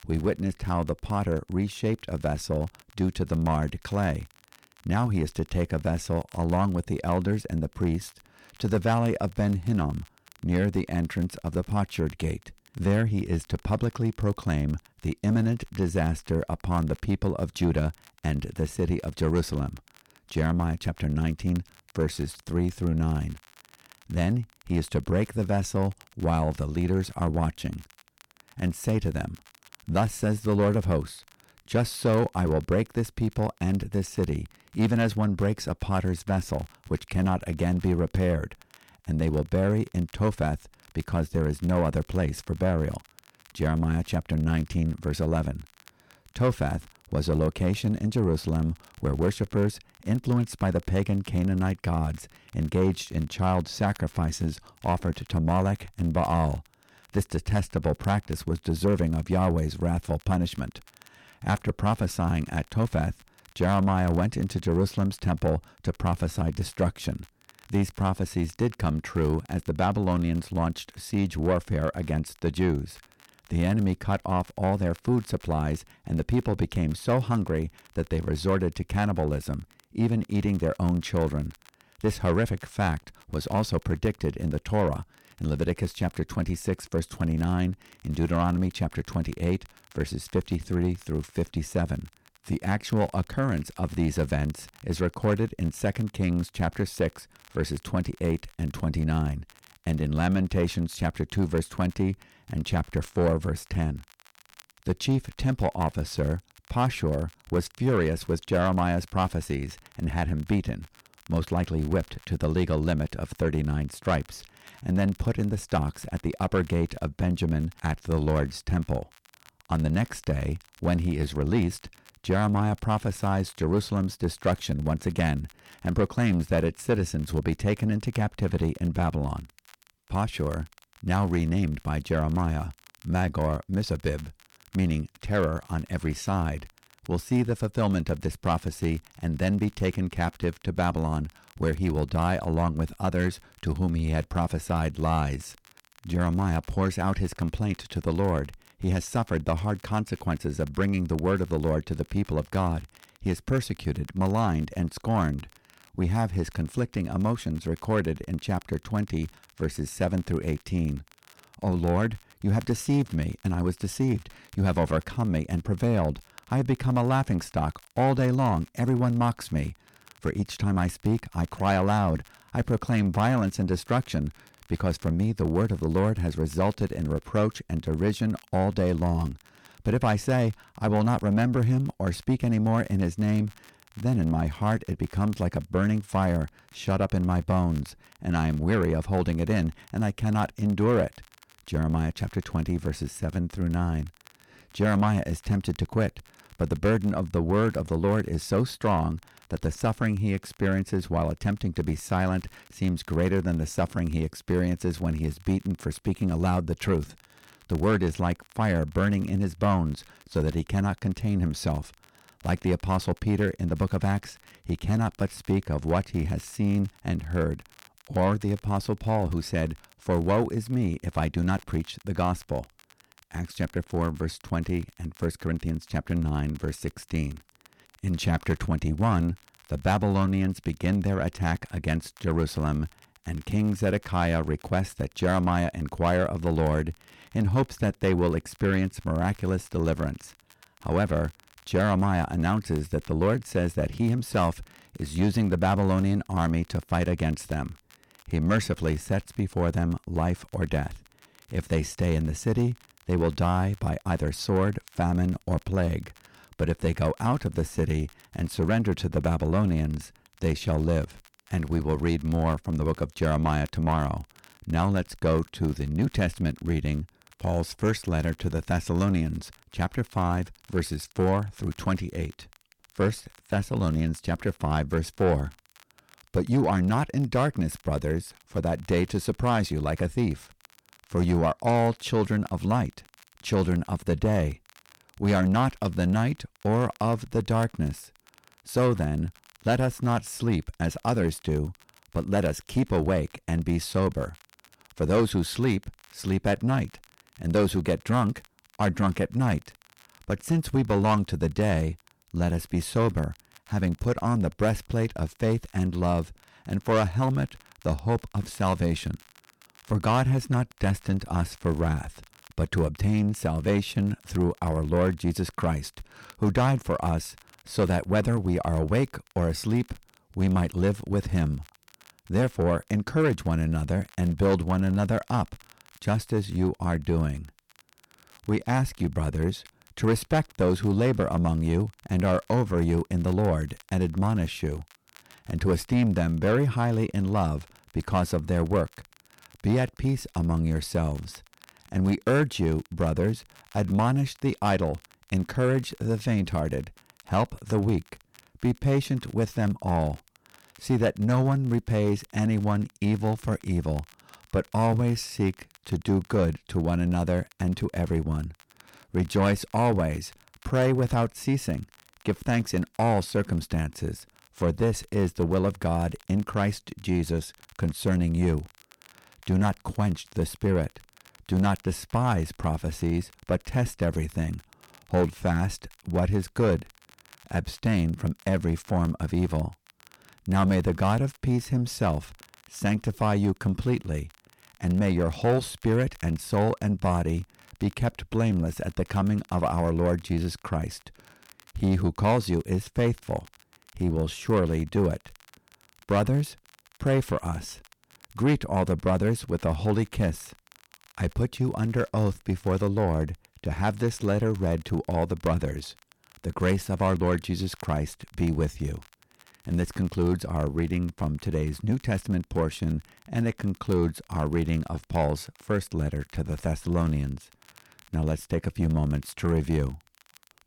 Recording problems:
distortion; slight; 10 dB below the speech
crackle, like an old record; faint; 30 dB below the speech

